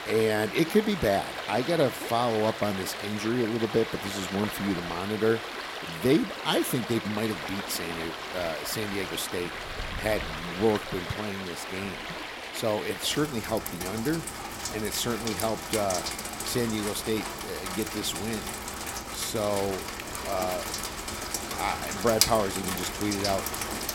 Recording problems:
rain or running water; loud; throughout; 4 dB below the speech

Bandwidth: 16.5 kHz